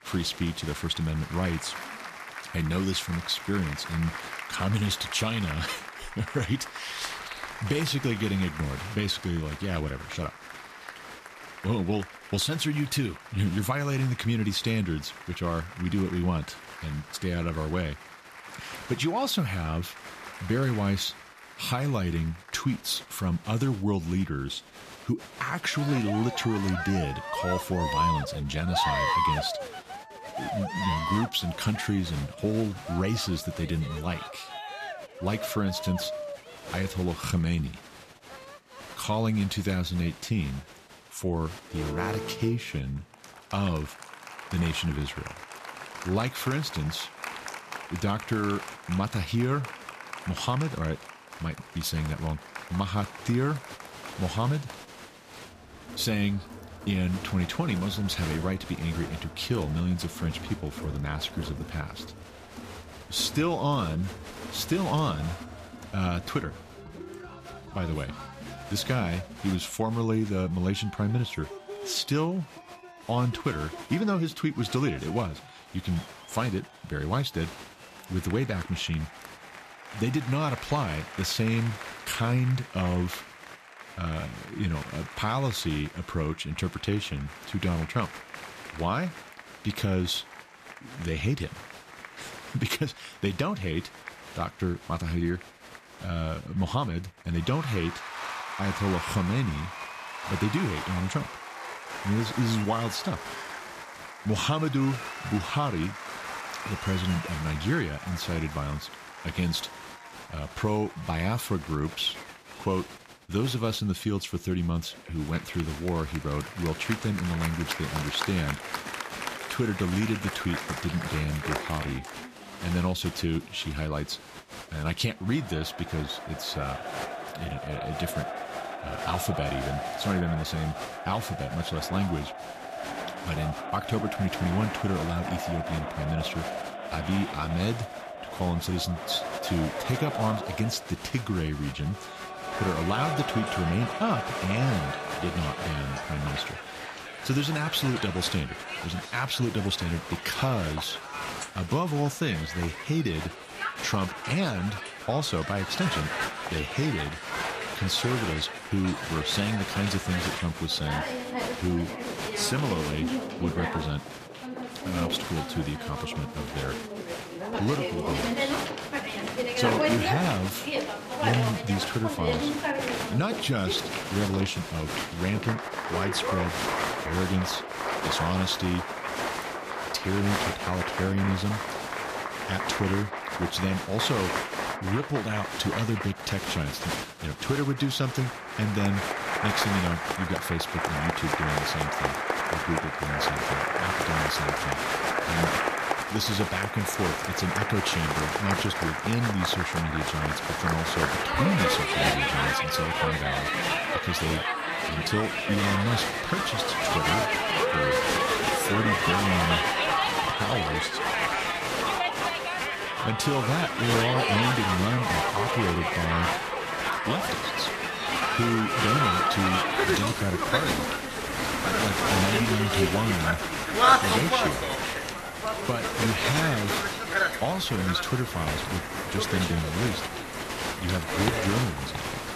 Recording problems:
crowd noise; loud; throughout; 1 dB below the speech

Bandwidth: 14.5 kHz